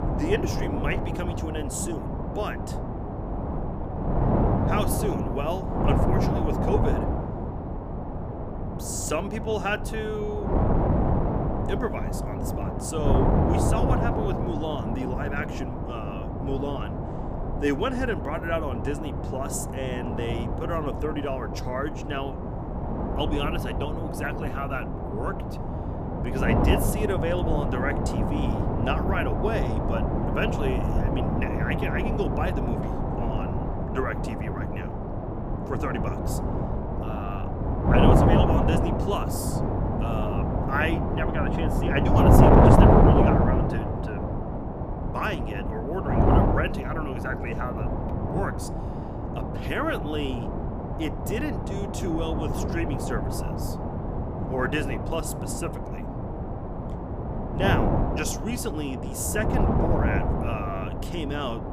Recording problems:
wind noise on the microphone; heavy; 2 dB above the speech

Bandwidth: 15 kHz